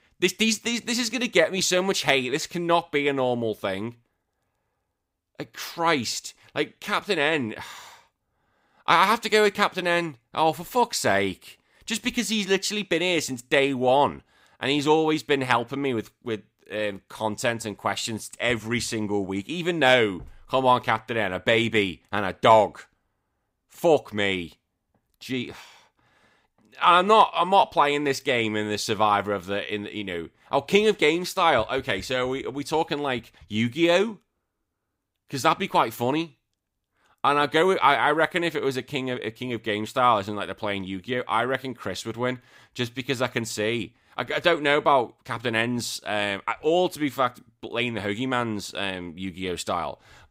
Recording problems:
none

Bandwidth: 15.5 kHz